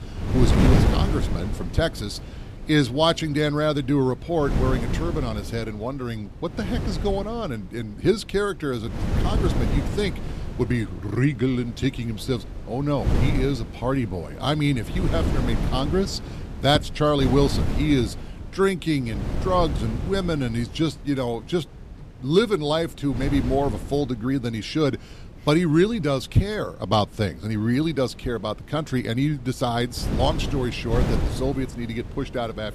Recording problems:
wind noise on the microphone; heavy; 9 dB below the speech

